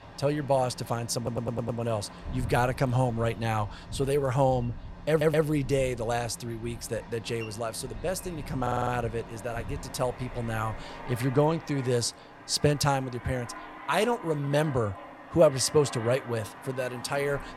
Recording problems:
train or aircraft noise; noticeable; throughout; 15 dB below the speech
audio stuttering; at 1 s, at 5 s and at 8.5 s

